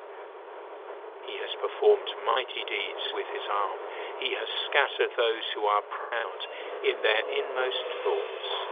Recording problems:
phone-call audio; nothing above 3.5 kHz
traffic noise; loud; throughout; 10 dB below the speech
choppy; occasionally; 3% of the speech affected

